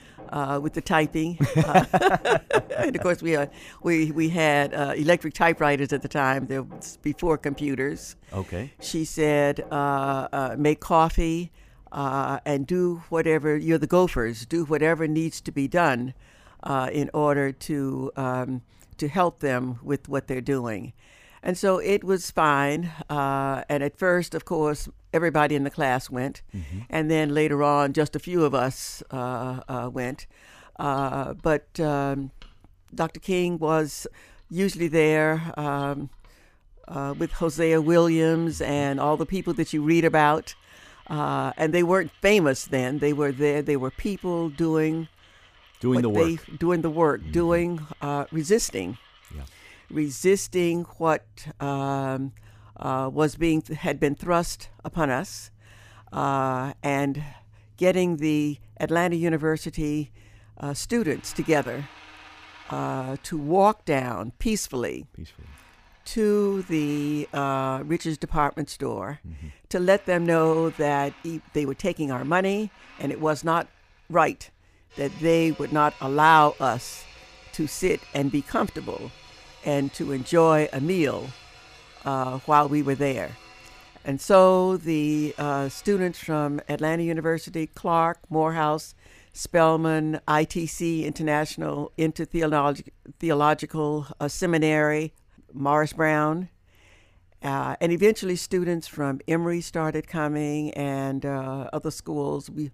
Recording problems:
machinery noise; faint; throughout; 25 dB below the speech

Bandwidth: 15 kHz